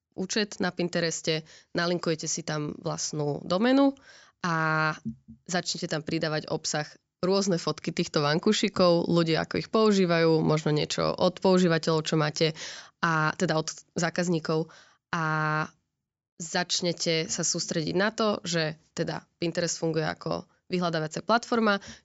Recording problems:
high frequencies cut off; noticeable; nothing above 8 kHz

